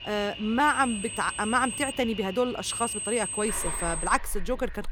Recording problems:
high-pitched whine; loud; from 0.5 to 2 s and from 2.5 to 4 s; 8.5 kHz, 5 dB below the speech
animal sounds; noticeable; throughout; 10 dB below the speech

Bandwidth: 17.5 kHz